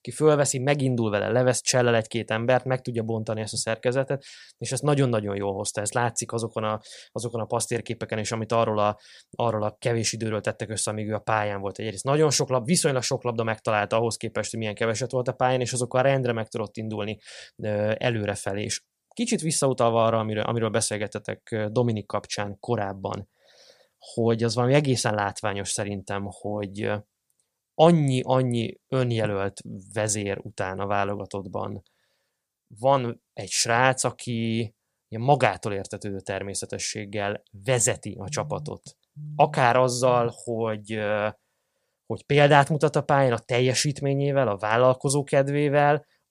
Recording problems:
none

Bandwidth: 15 kHz